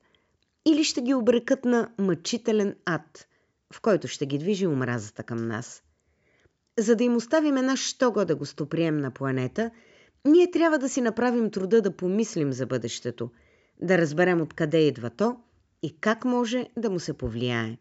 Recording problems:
high frequencies cut off; noticeable; nothing above 8 kHz

